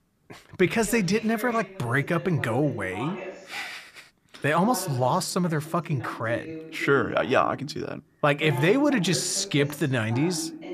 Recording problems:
voice in the background; noticeable; throughout; 15 dB below the speech

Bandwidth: 14.5 kHz